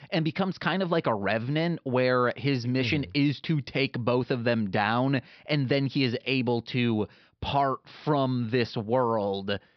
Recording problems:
high frequencies cut off; noticeable; nothing above 5.5 kHz

